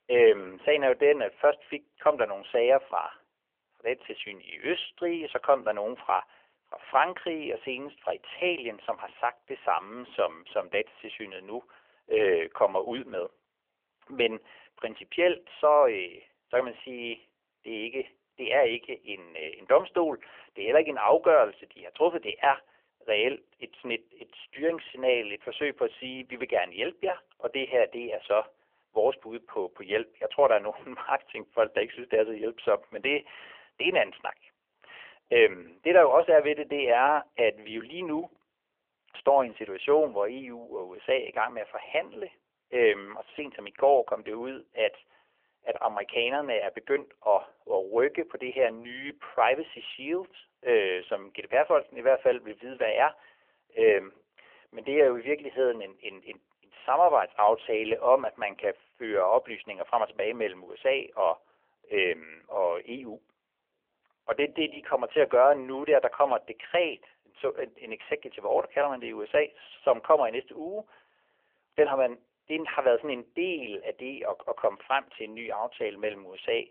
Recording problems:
phone-call audio; nothing above 3 kHz

